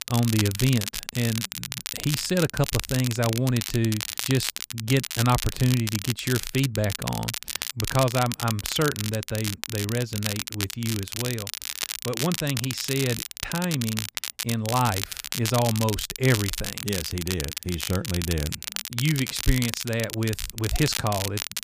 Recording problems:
crackle, like an old record; loud; 4 dB below the speech

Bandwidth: 15 kHz